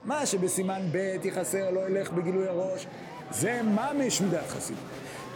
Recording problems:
murmuring crowd; noticeable; throughout; 10 dB below the speech

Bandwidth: 17 kHz